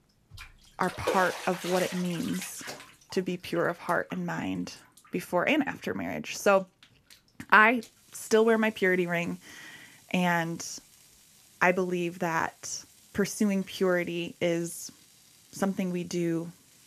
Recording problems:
household noises; noticeable; throughout; 15 dB below the speech

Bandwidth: 14 kHz